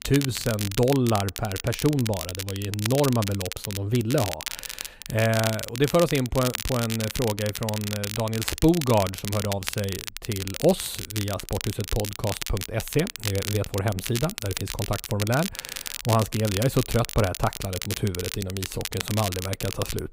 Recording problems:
crackle, like an old record; loud; 6 dB below the speech

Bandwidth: 15.5 kHz